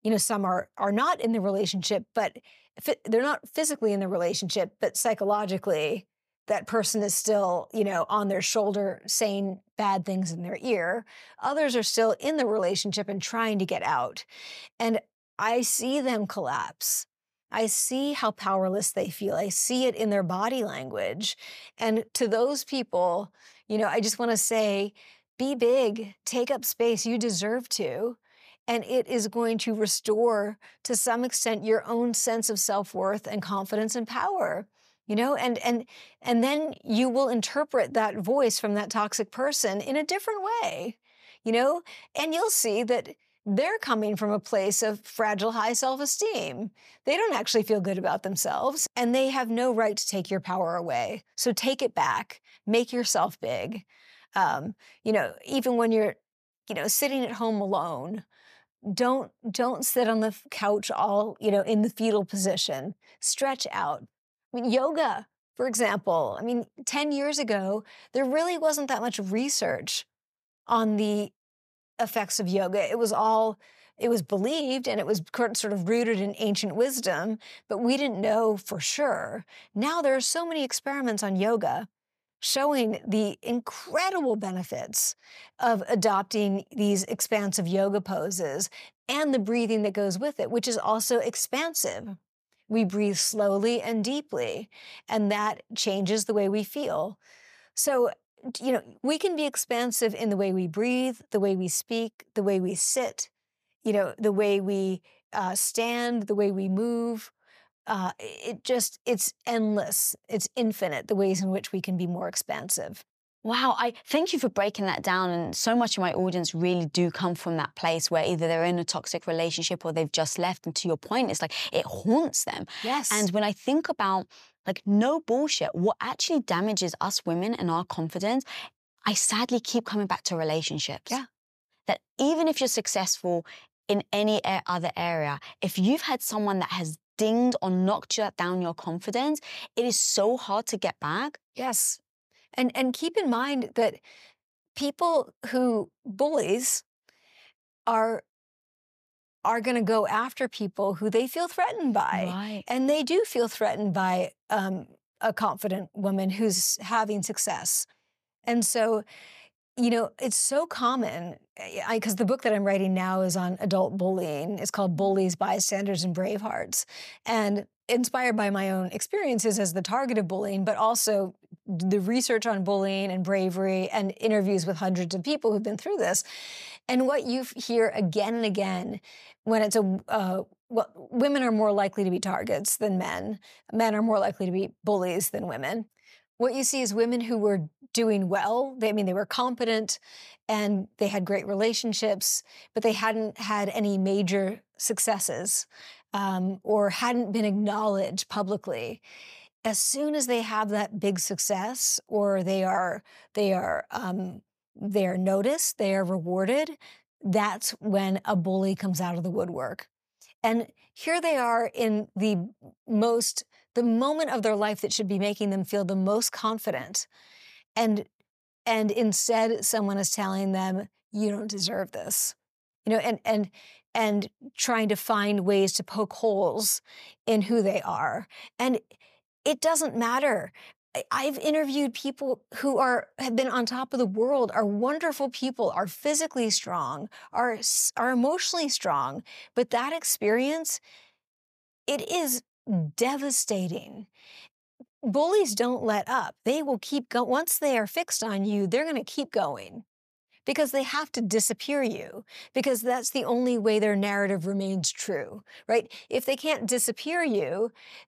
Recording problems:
none

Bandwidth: 14.5 kHz